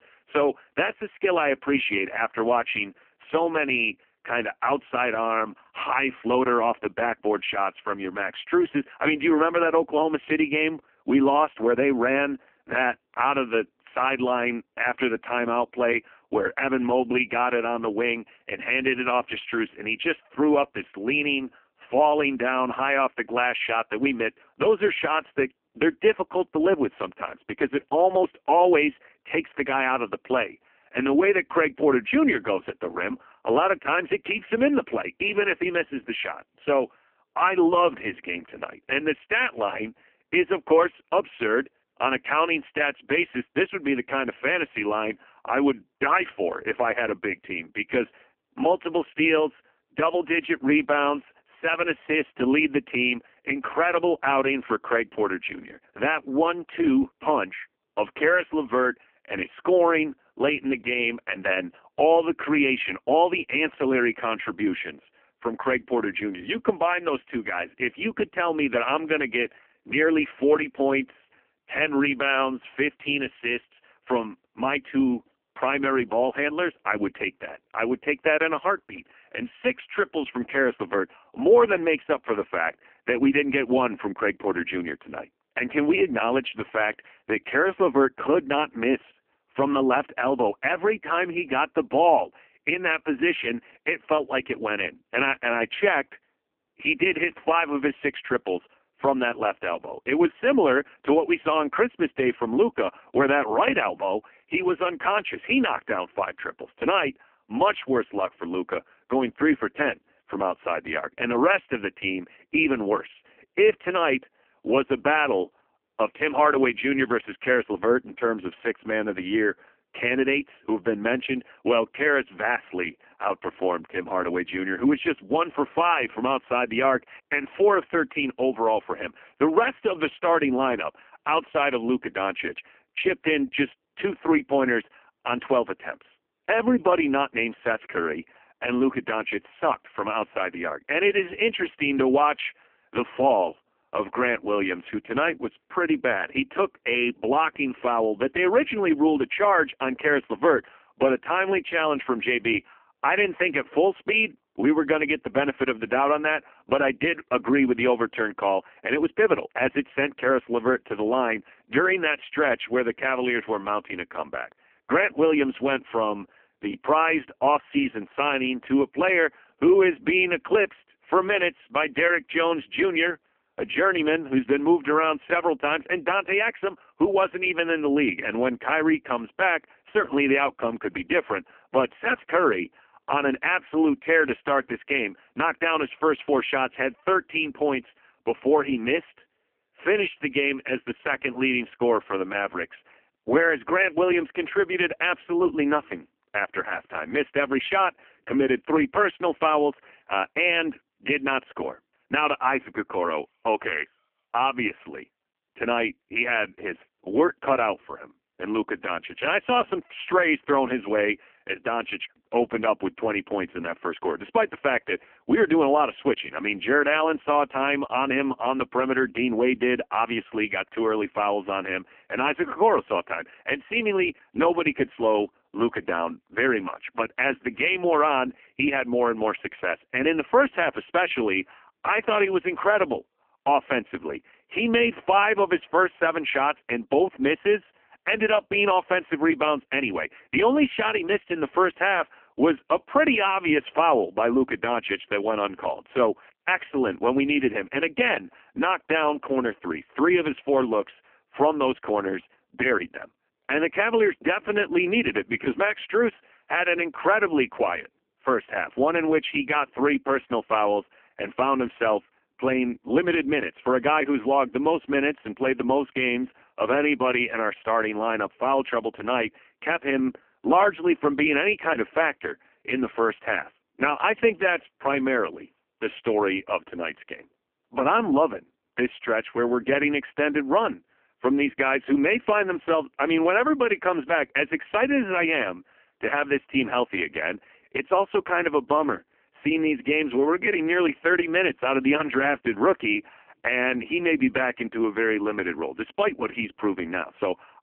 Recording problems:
phone-call audio; poor line; nothing above 3 kHz

